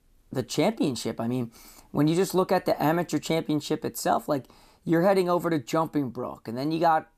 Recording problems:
none

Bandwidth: 14.5 kHz